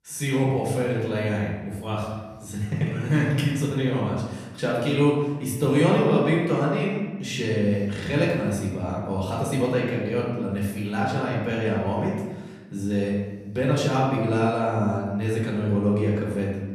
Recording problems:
off-mic speech; far
room echo; noticeable; dies away in 1 s

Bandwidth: 14 kHz